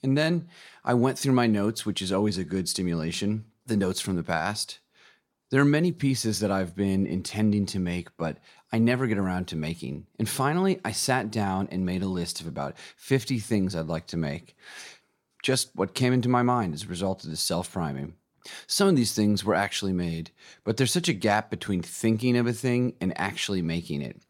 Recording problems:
none

